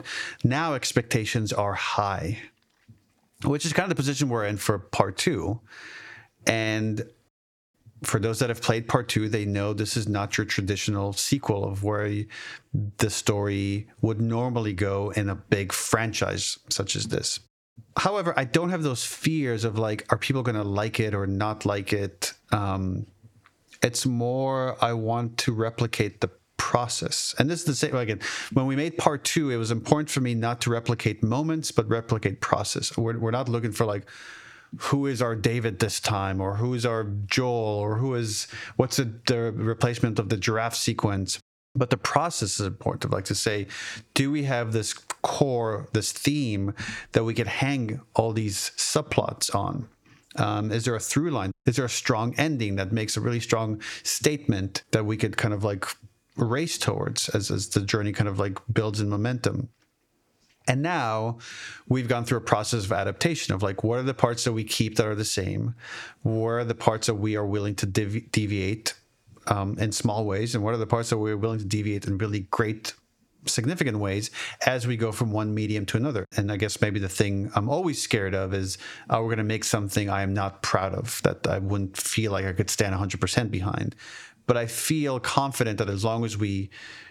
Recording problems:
squashed, flat; heavily

